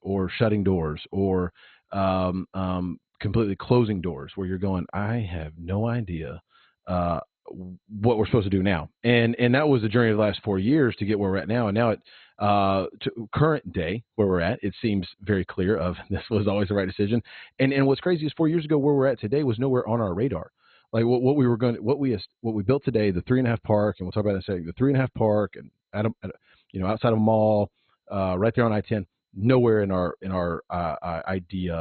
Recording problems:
garbled, watery; badly; nothing above 4 kHz
abrupt cut into speech; at the end

